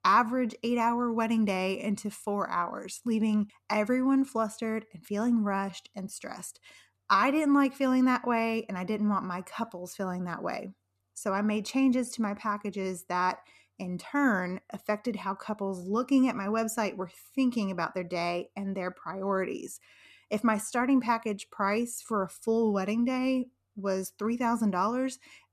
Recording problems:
none

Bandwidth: 14 kHz